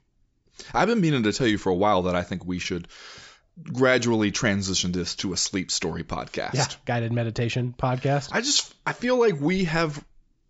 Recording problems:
high frequencies cut off; noticeable; nothing above 8 kHz

